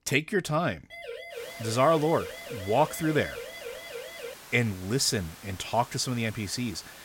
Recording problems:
hiss; noticeable; from 1.5 s on; 20 dB below the speech
siren; faint; from 1 to 4.5 s; peak 10 dB below the speech

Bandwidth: 16.5 kHz